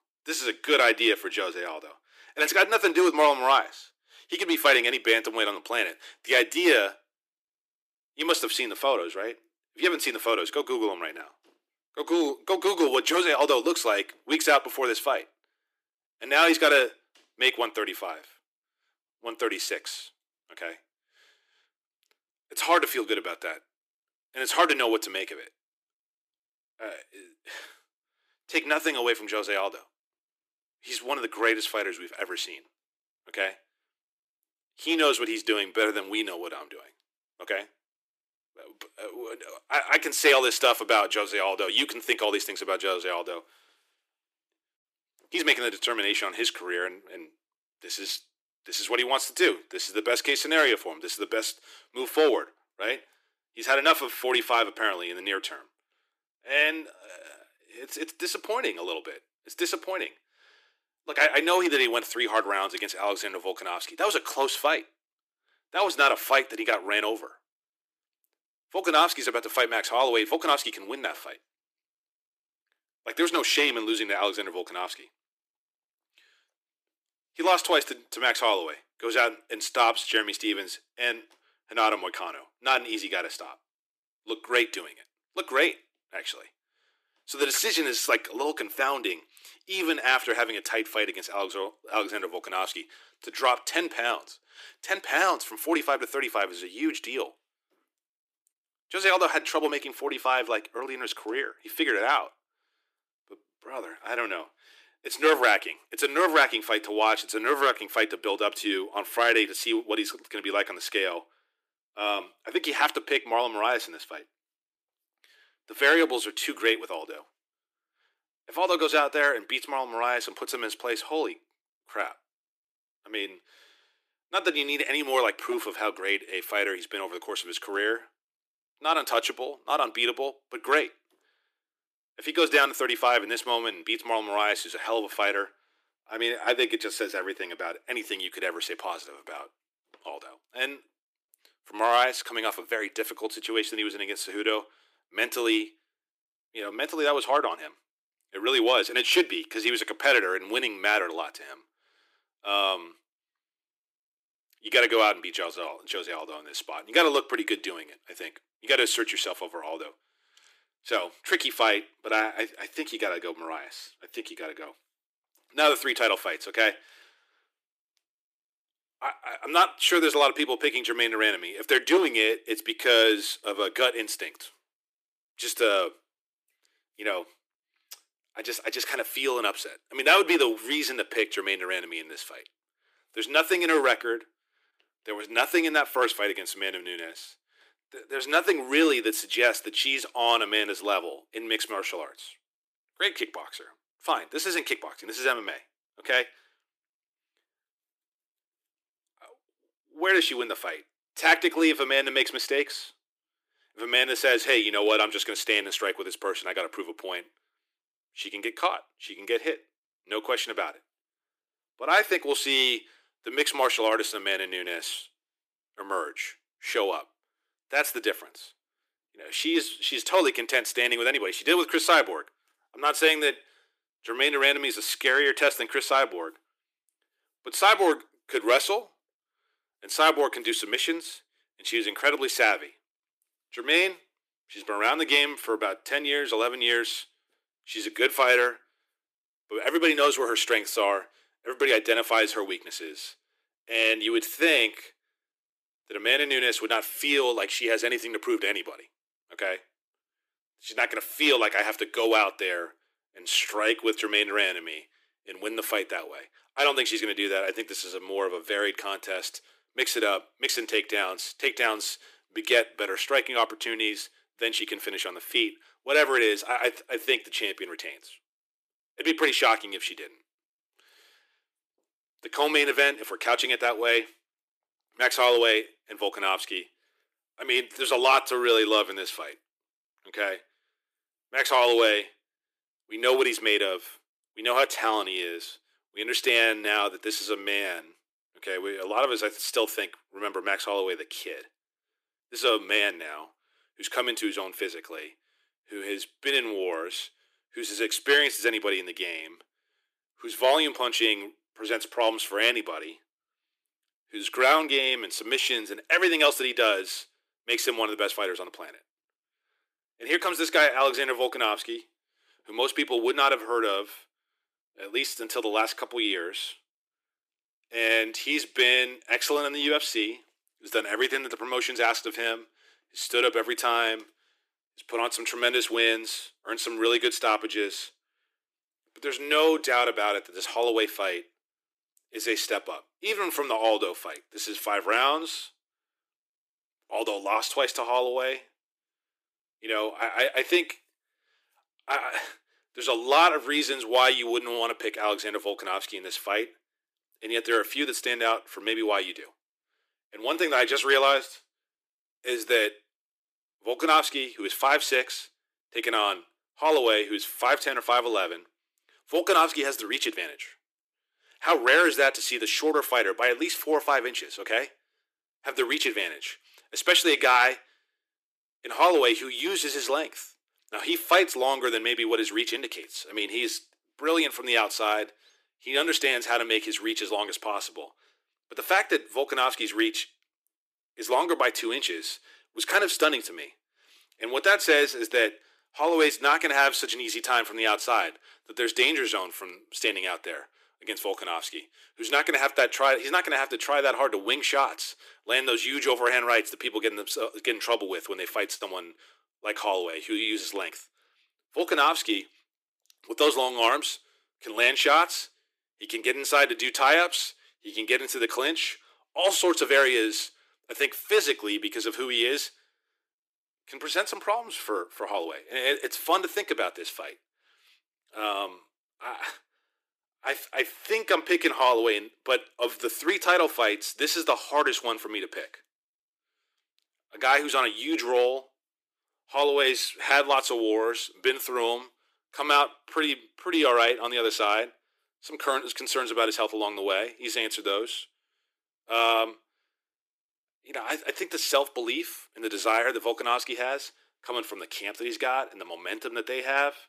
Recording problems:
thin; very; fading below 300 Hz

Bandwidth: 15 kHz